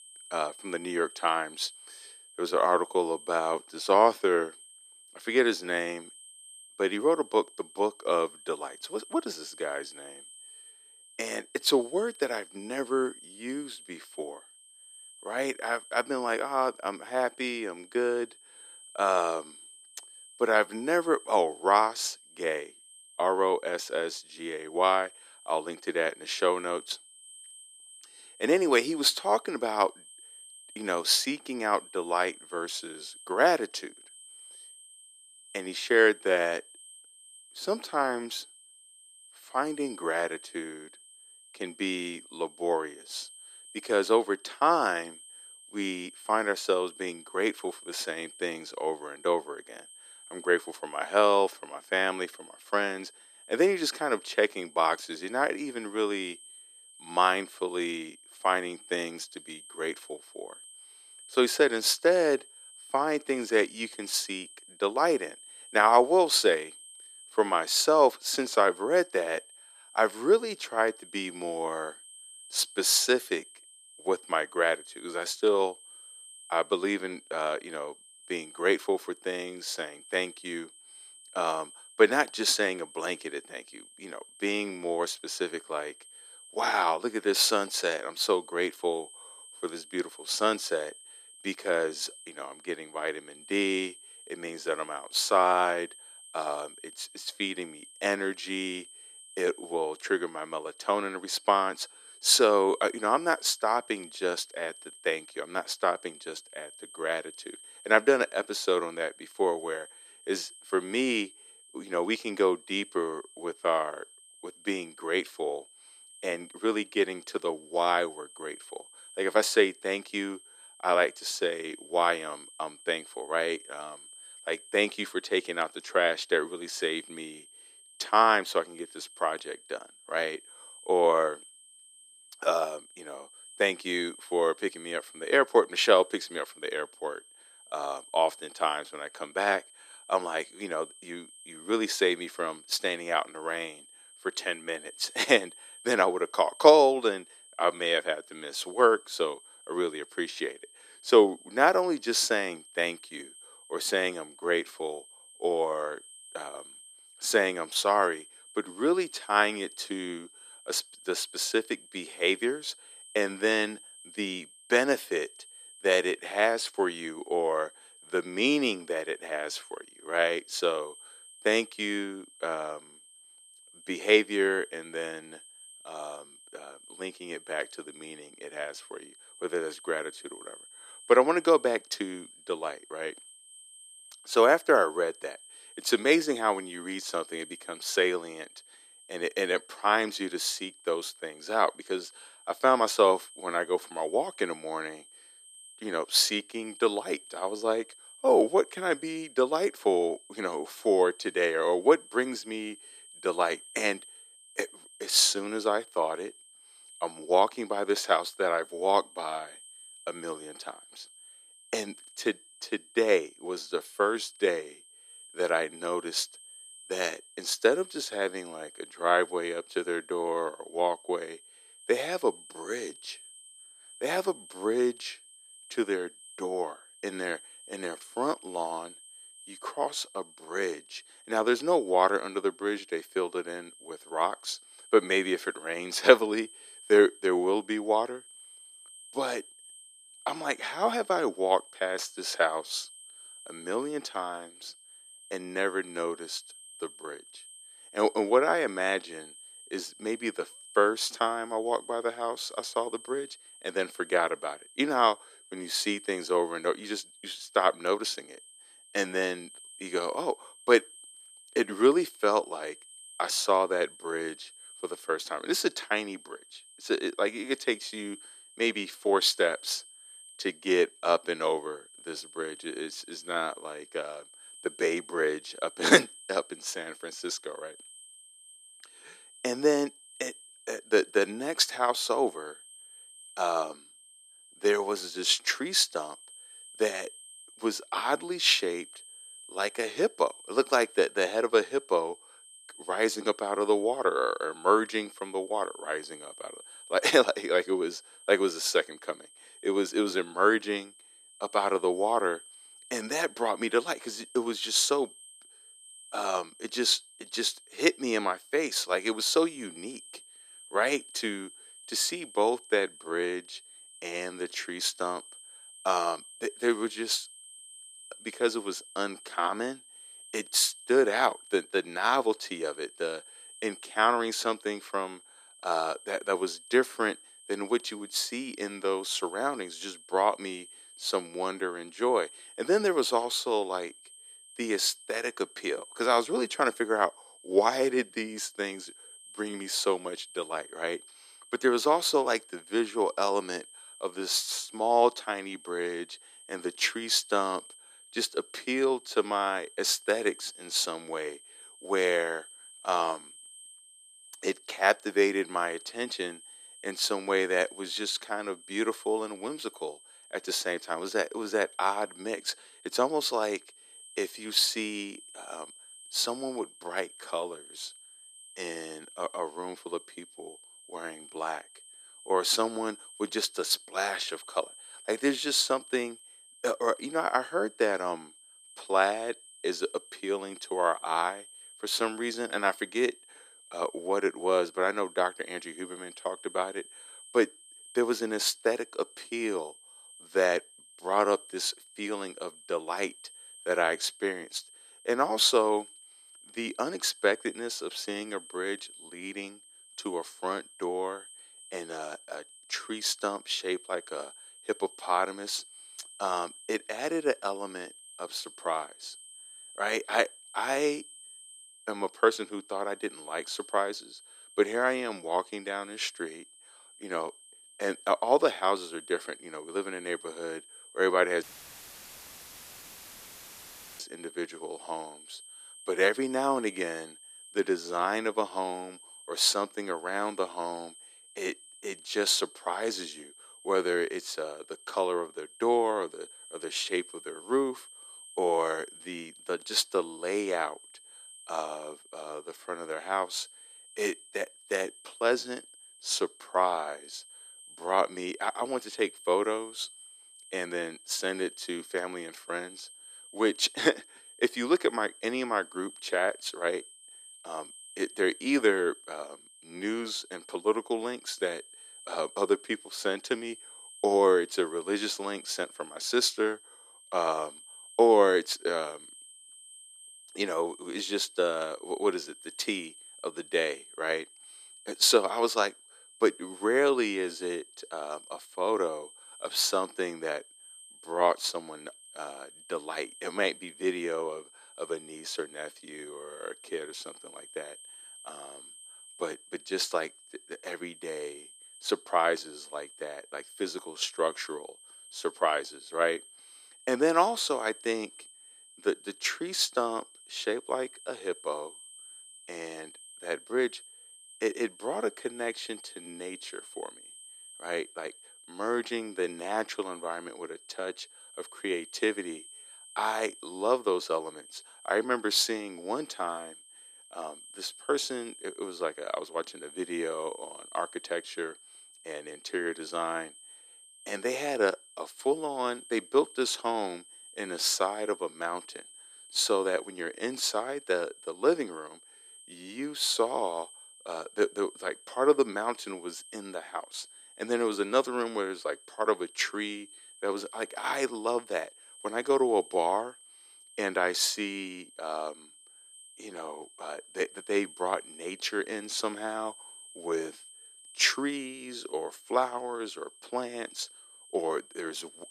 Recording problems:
thin; very; fading below 350 Hz
high-pitched whine; noticeable; throughout; 8.5 kHz, 20 dB below the speech
audio cutting out; filled with static; at 7:01 for 2.5 s

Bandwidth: 14.5 kHz